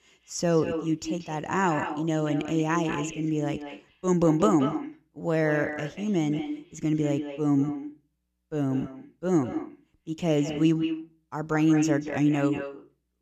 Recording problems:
echo of what is said; strong; throughout; 180 ms later, 8 dB below the speech

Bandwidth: 14.5 kHz